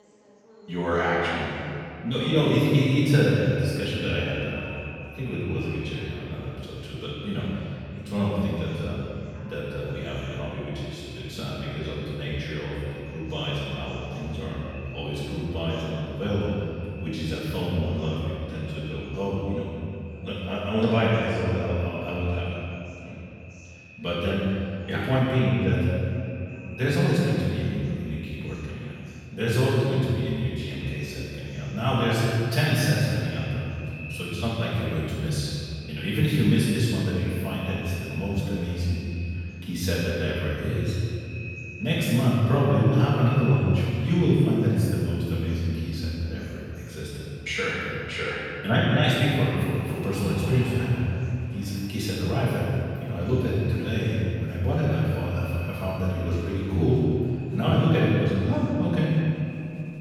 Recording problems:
room echo; strong; dies away in 2.5 s
off-mic speech; far
echo of what is said; faint; throughout; 380 ms later, 20 dB below the speech
chatter from many people; faint; throughout; 30 dB below the speech

